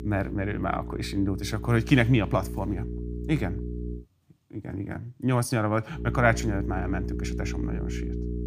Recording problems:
electrical hum; noticeable; until 4 s and from 6 s on; 60 Hz, 15 dB below the speech

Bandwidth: 15 kHz